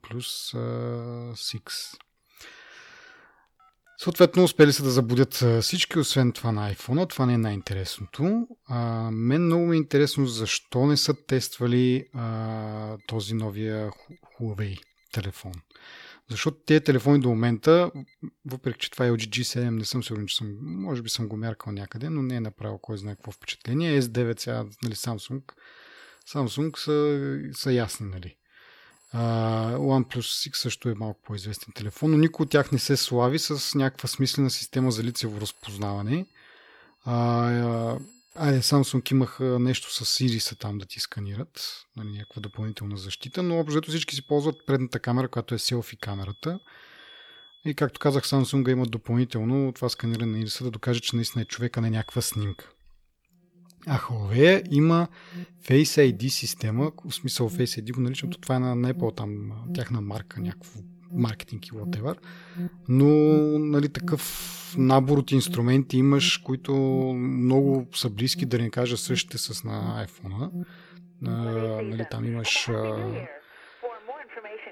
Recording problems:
alarms or sirens; noticeable; throughout; 15 dB below the speech

